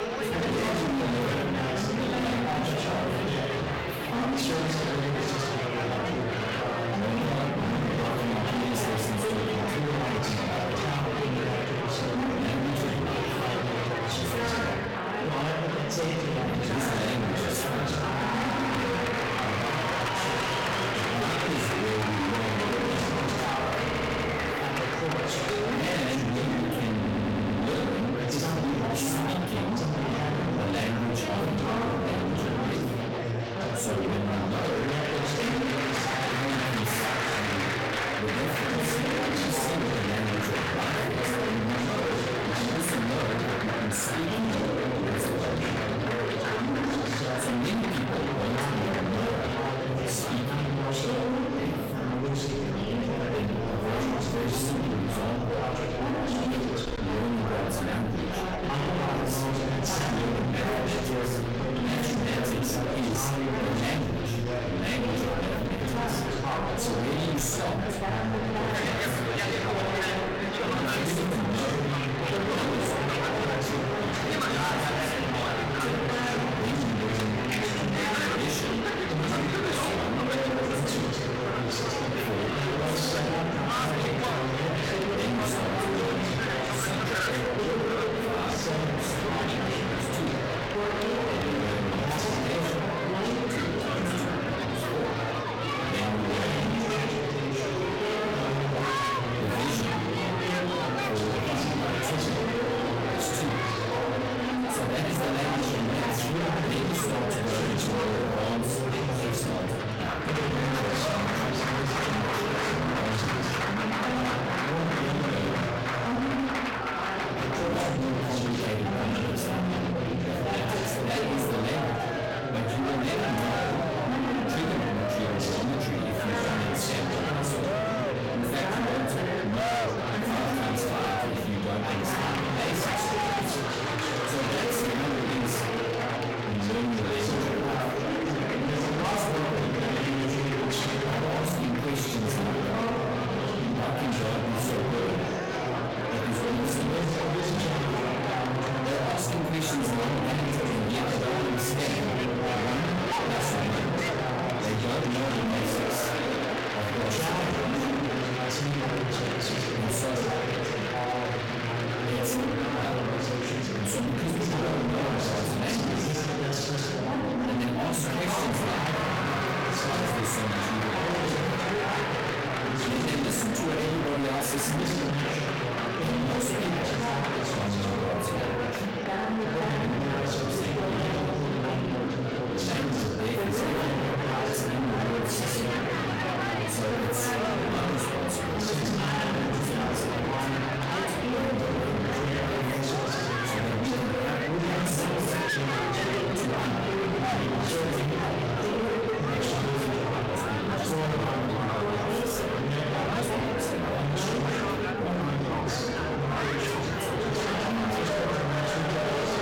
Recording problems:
distortion; heavy; 48% of the sound clipped
off-mic speech; far
room echo; slight; dies away in 0.4 s
chatter from many people; very loud; throughout; 2 dB above the speech
background music; faint; throughout; 20 dB below the speech
audio stuttering; at 24 s and at 27 s

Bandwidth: 17 kHz